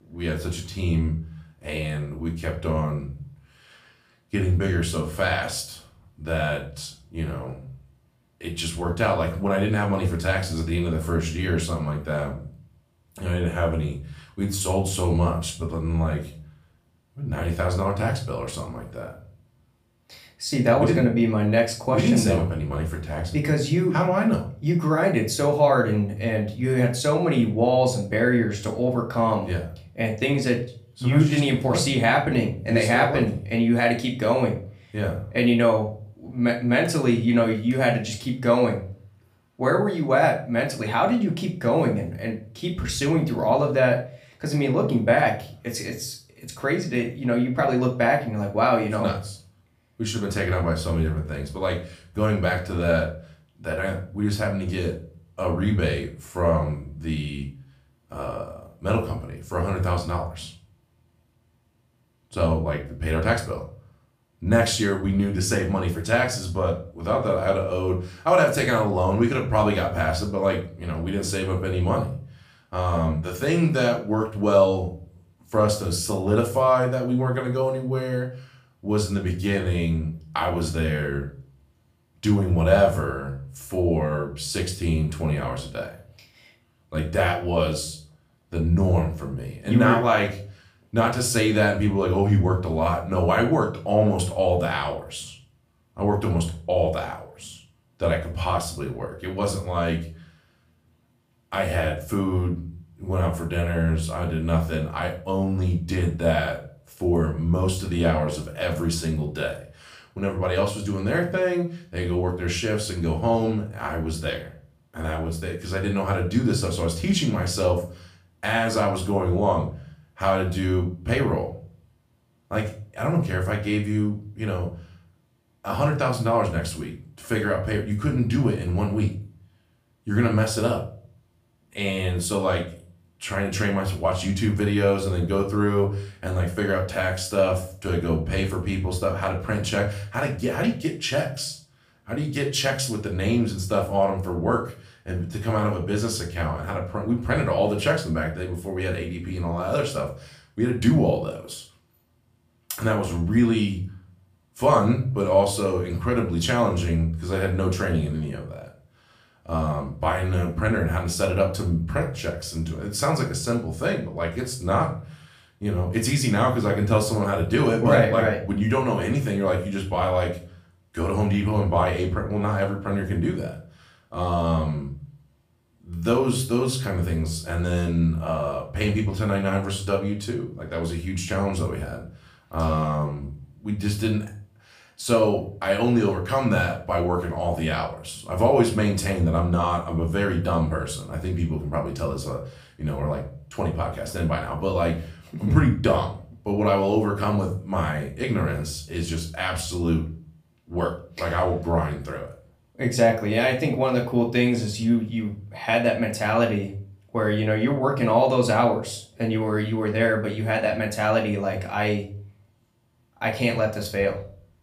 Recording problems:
room echo; slight; dies away in 0.4 s
off-mic speech; somewhat distant

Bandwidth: 15 kHz